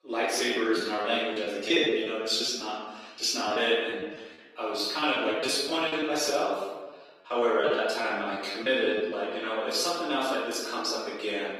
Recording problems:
off-mic speech; far
room echo; noticeable; dies away in 1.1 s
thin; somewhat; fading below 300 Hz
garbled, watery; slightly
choppy; very; from 0.5 to 2.5 s, from 3.5 to 6 s and from 7.5 to 9 s; 13% of the speech affected

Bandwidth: 15 kHz